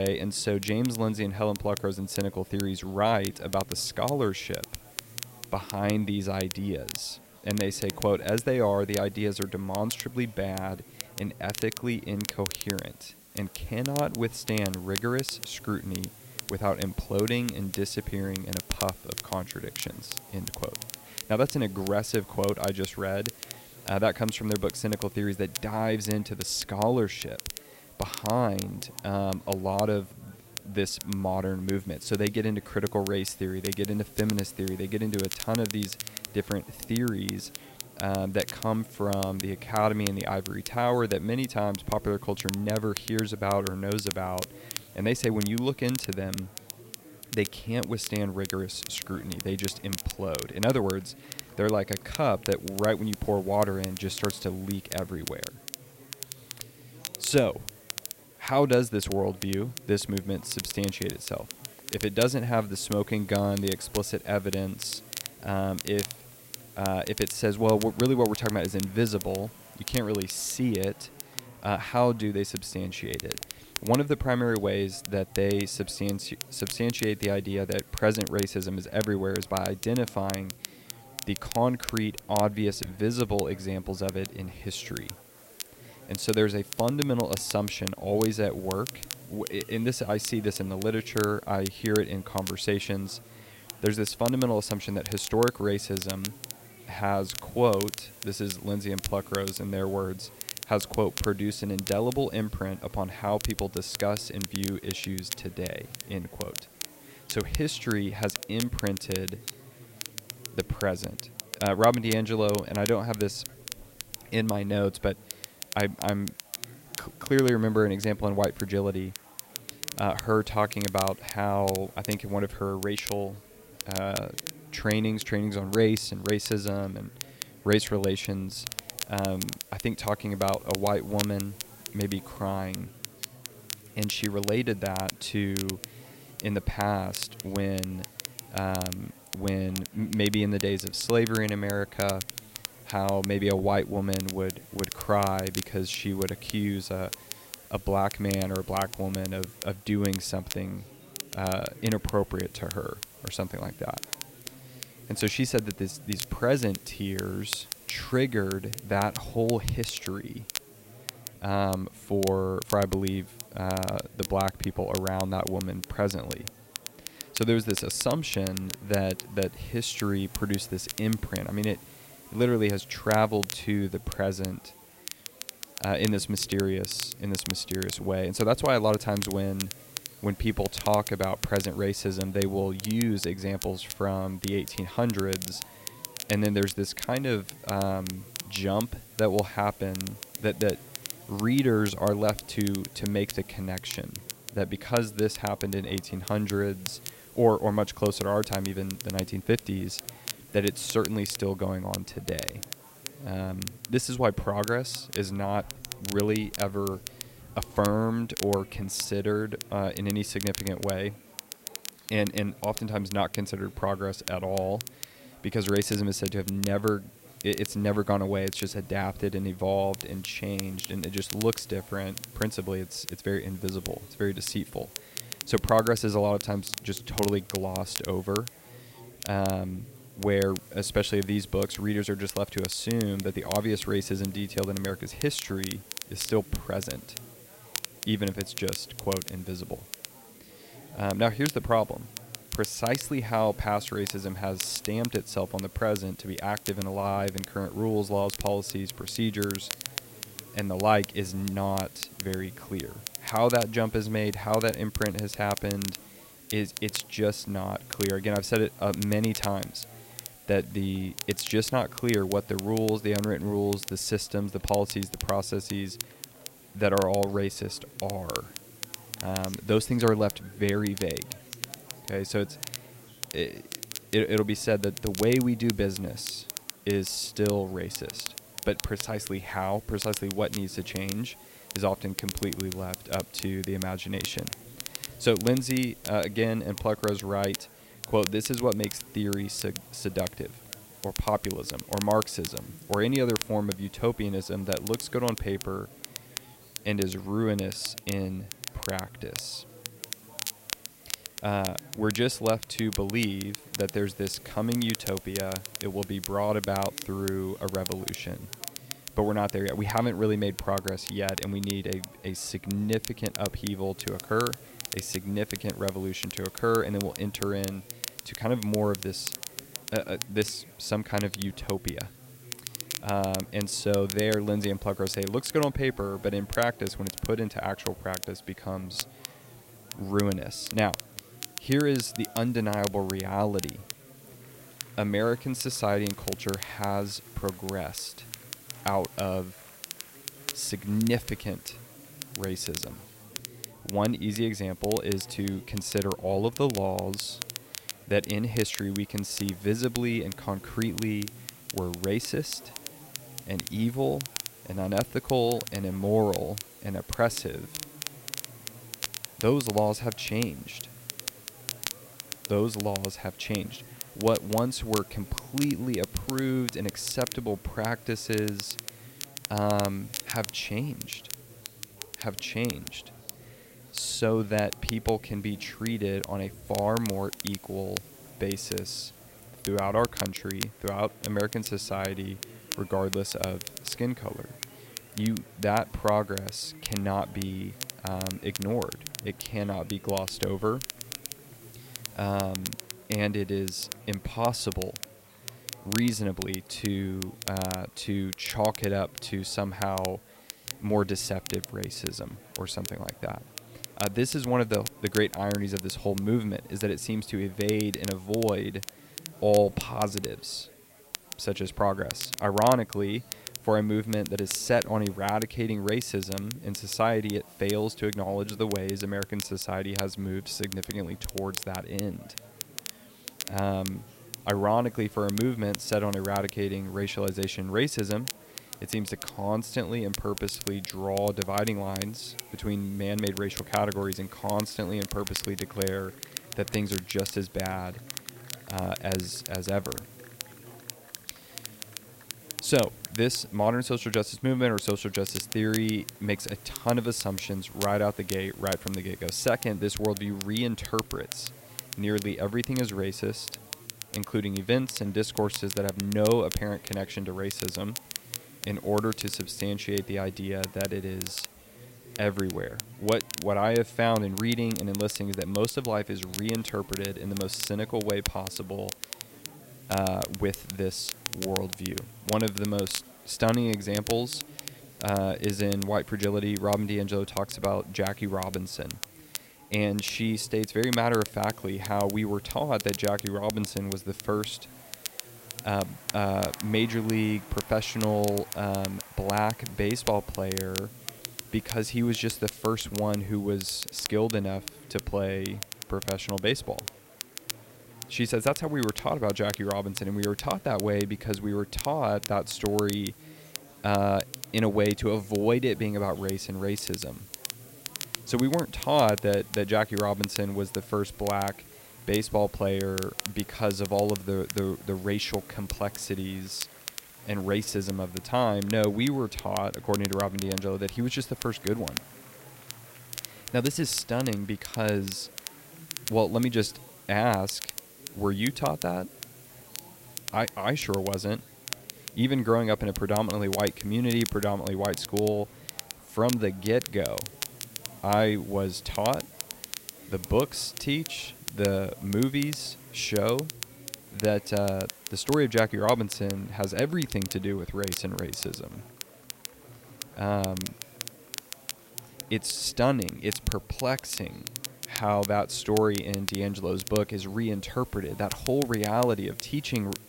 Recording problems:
crackle, like an old record; loud; 9 dB below the speech
murmuring crowd; faint; throughout; 20 dB below the speech
hiss; faint; throughout; 20 dB below the speech
abrupt cut into speech; at the start

